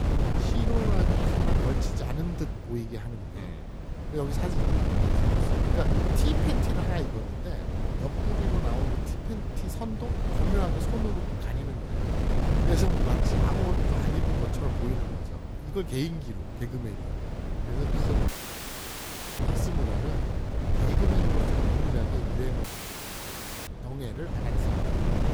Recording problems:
wind noise on the microphone; heavy; 3 dB above the speech
audio cutting out; at 18 s for 1 s and at 23 s for 1 s

